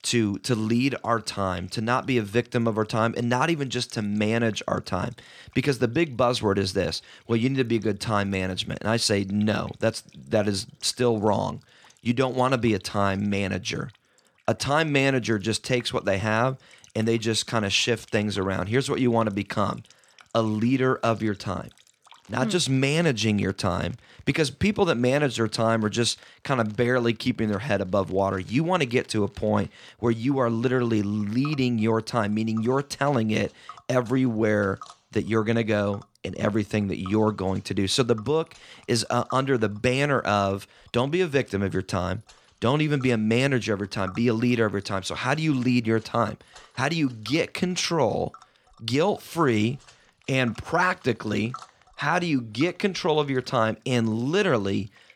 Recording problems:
household noises; faint; throughout; 25 dB below the speech

